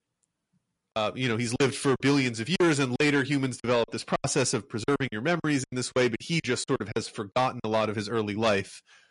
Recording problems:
distortion; slight; 10 dB below the speech
garbled, watery; slightly; nothing above 10.5 kHz
choppy; very; from 1 to 4 s and from 5 to 7.5 s; 13% of the speech affected

